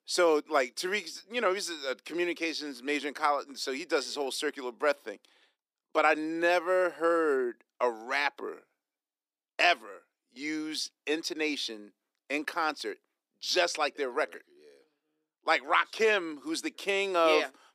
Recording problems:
thin; somewhat; fading below 300 Hz

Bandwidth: 15 kHz